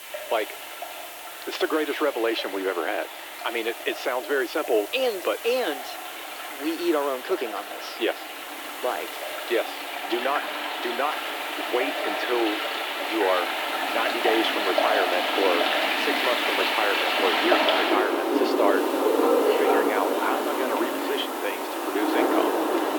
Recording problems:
thin; very; fading below 300 Hz
muffled; slightly; fading above 2.5 kHz
rain or running water; very loud; throughout; 2 dB above the speech
hiss; noticeable; throughout; 15 dB below the speech

